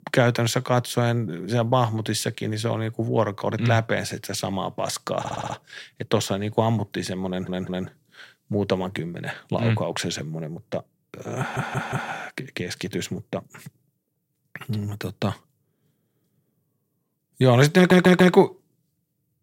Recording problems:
audio stuttering; 4 times, first at 5 s

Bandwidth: 16 kHz